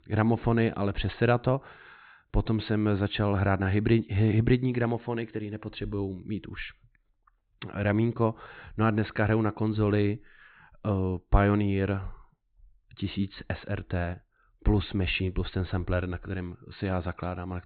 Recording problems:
high frequencies cut off; severe; nothing above 4 kHz

